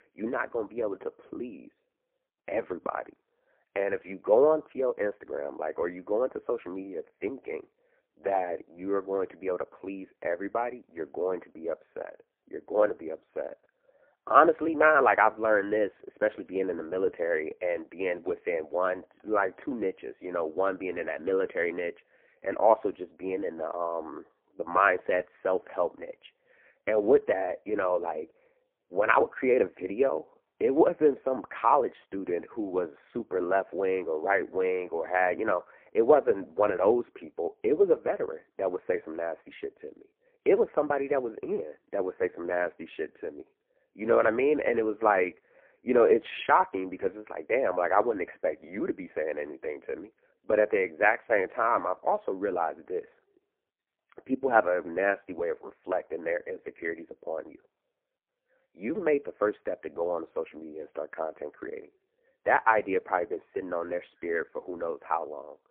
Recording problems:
phone-call audio; poor line; nothing above 3.5 kHz
muffled; very slightly; fading above 2.5 kHz

